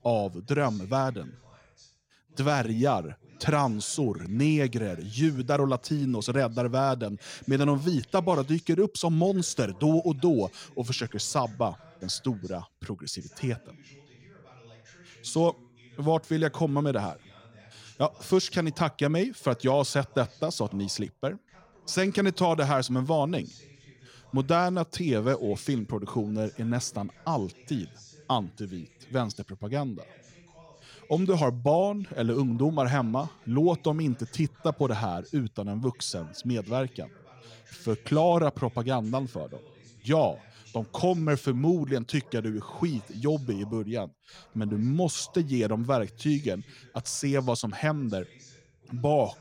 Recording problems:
voice in the background; faint; throughout; 25 dB below the speech

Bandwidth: 16.5 kHz